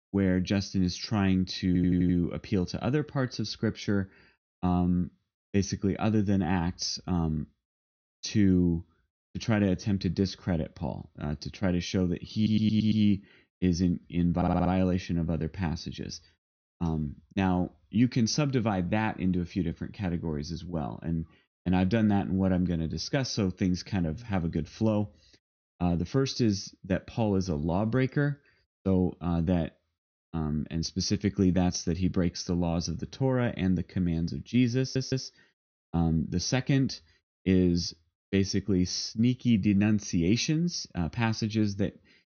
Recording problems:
high frequencies cut off; noticeable; nothing above 6 kHz
audio stuttering; 4 times, first at 1.5 s

